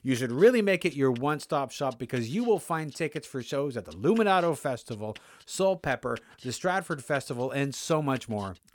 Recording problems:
none

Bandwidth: 17.5 kHz